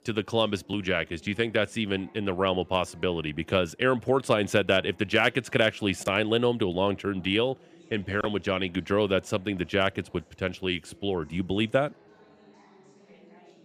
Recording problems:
chatter from many people; faint; throughout; 30 dB below the speech

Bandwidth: 15 kHz